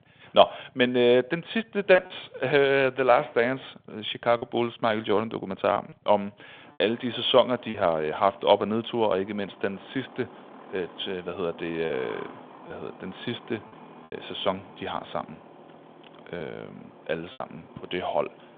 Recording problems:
phone-call audio
traffic noise; faint; throughout; 20 dB below the speech
choppy; occasionally; 3% of the speech affected

